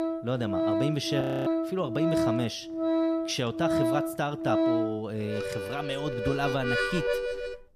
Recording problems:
background music; very loud; throughout; 2 dB above the speech
audio freezing; at 1 s

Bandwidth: 14.5 kHz